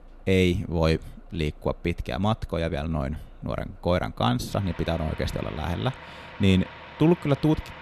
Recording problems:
traffic noise; noticeable; throughout; 20 dB below the speech

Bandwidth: 13.5 kHz